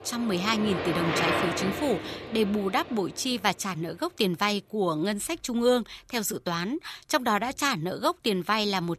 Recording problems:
traffic noise; loud; throughout; 4 dB below the speech

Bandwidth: 14.5 kHz